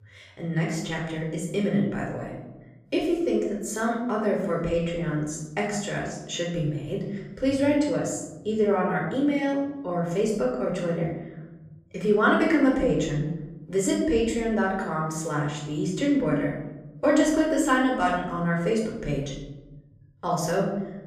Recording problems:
off-mic speech; far
room echo; noticeable; dies away in 1.1 s

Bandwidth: 15 kHz